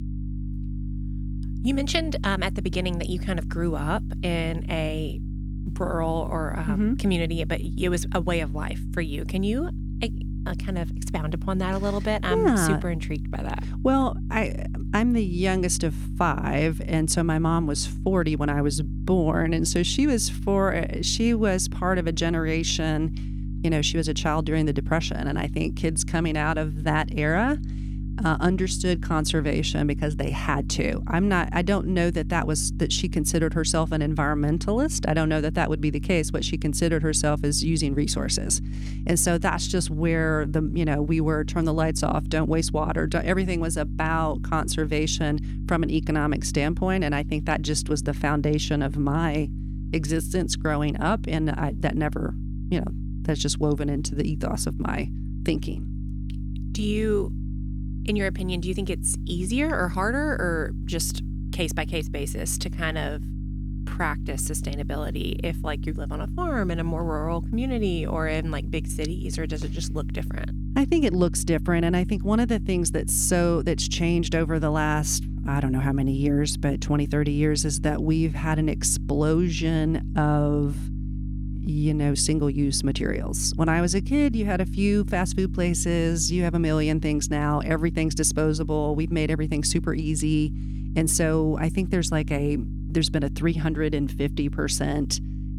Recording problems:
electrical hum; noticeable; throughout; 50 Hz, 15 dB below the speech

